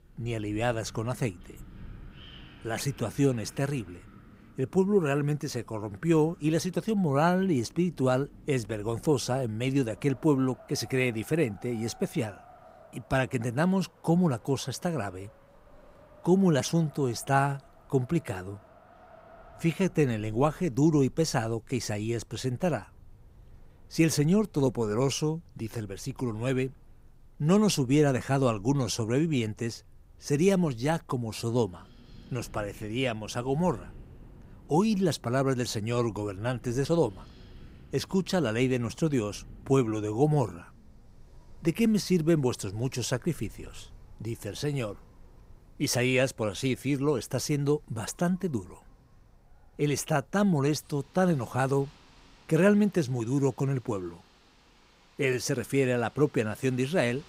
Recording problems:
wind in the background; faint; throughout; 25 dB below the speech

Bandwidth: 15.5 kHz